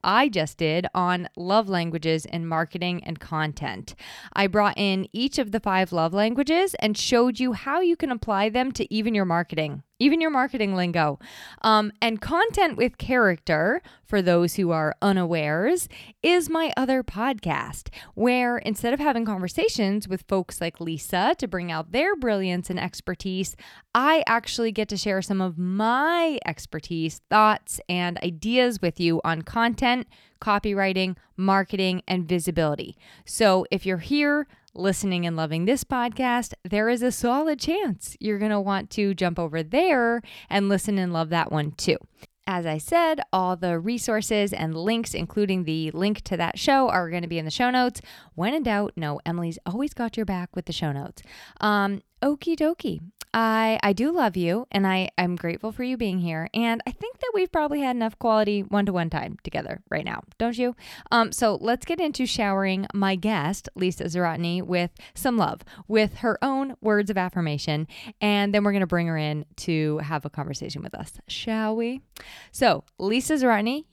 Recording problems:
none

